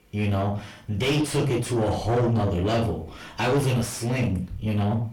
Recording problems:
distortion; heavy; 5 dB below the speech
off-mic speech; far
room echo; very slight; dies away in 0.3 s

